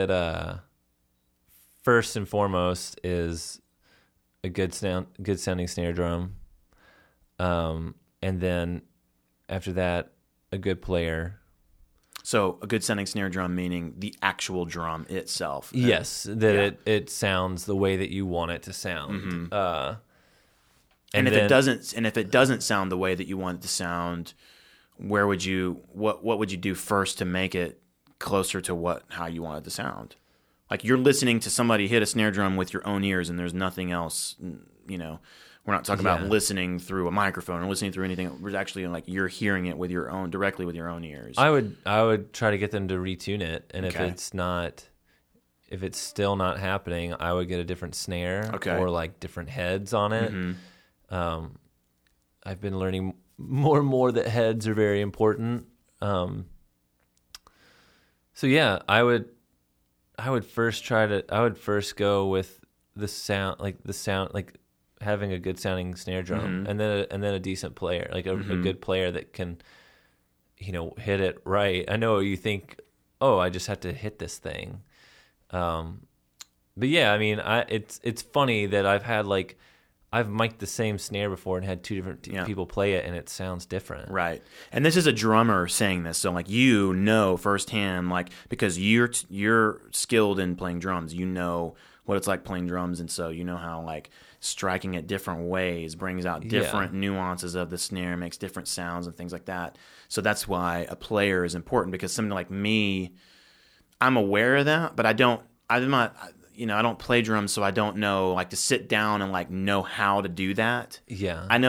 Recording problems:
abrupt cut into speech; at the start and the end

